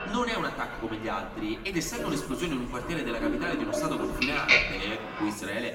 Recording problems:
off-mic speech; far
room echo; noticeable; dies away in 1.8 s
household noises; very loud; throughout; 3 dB above the speech

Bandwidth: 16.5 kHz